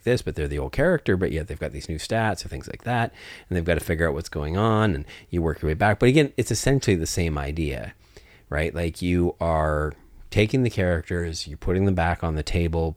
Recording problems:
none

